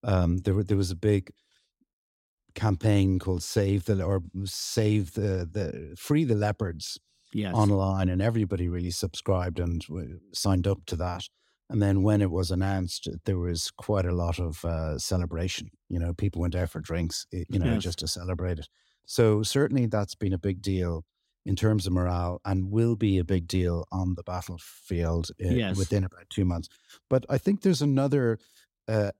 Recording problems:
none

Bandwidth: 16 kHz